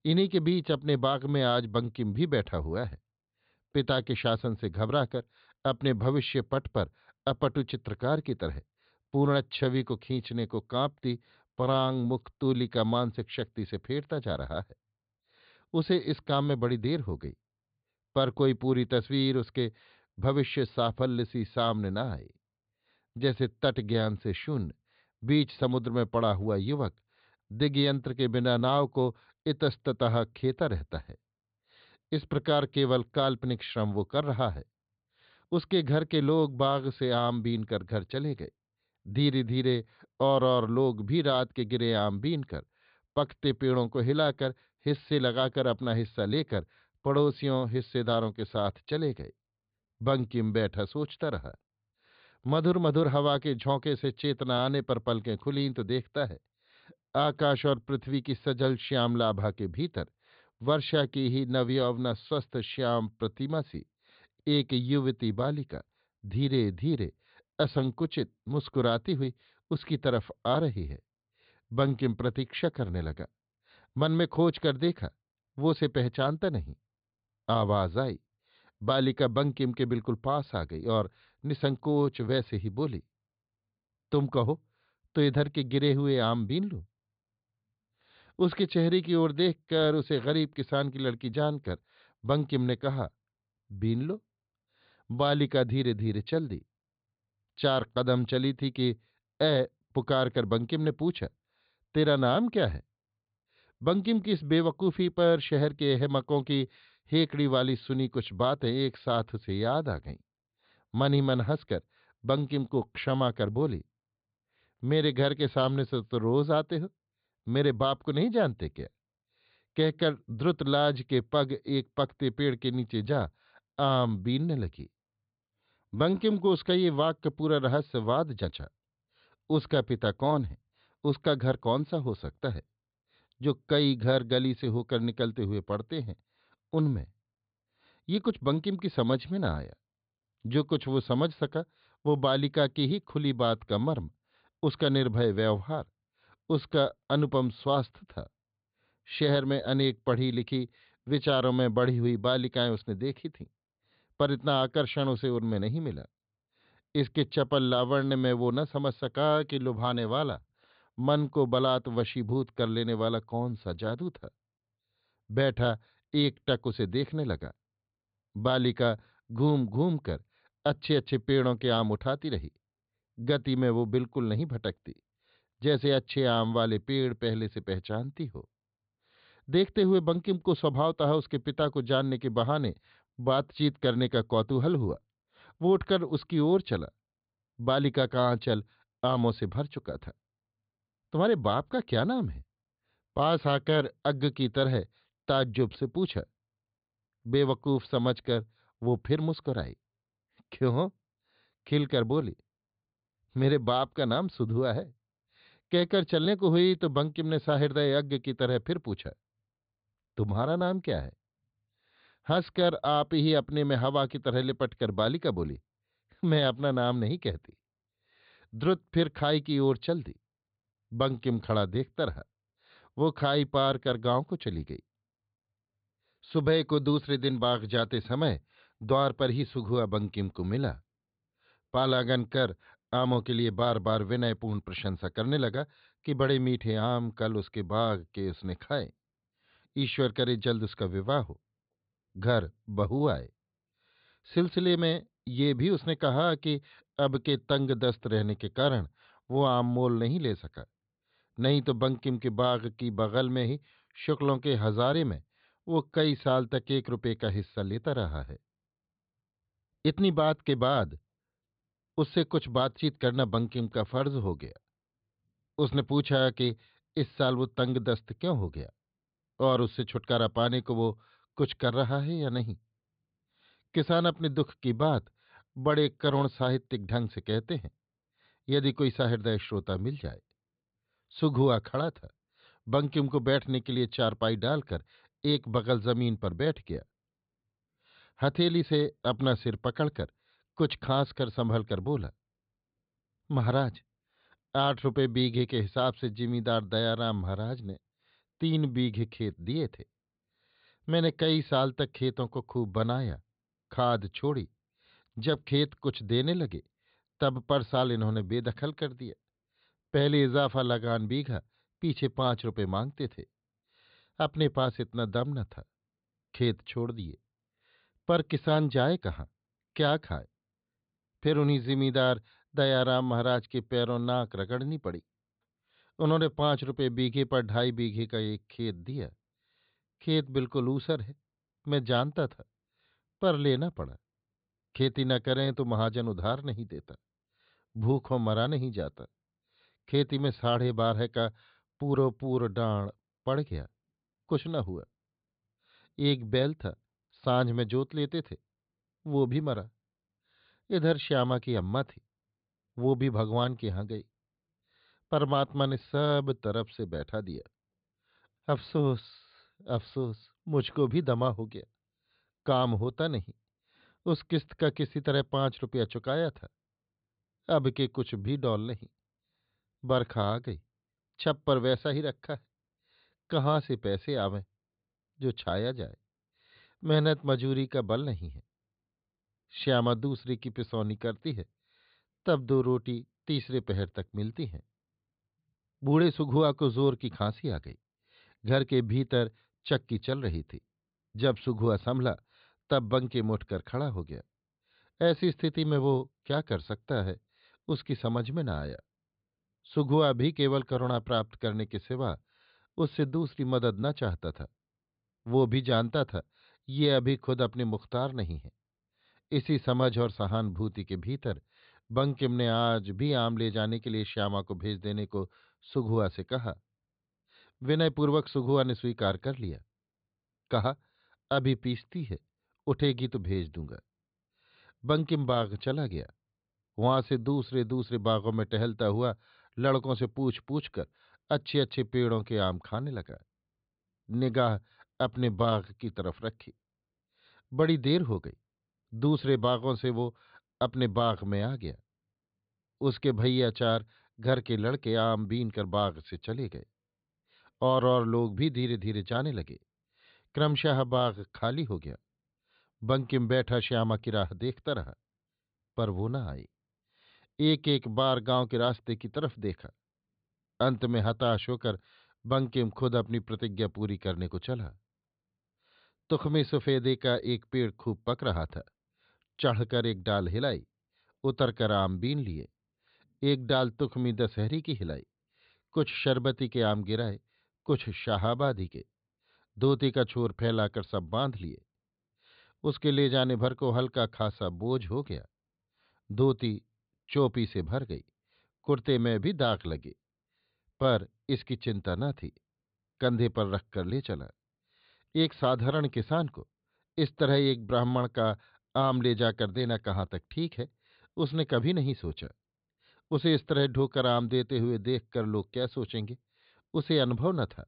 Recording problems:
high frequencies cut off; severe; nothing above 4.5 kHz

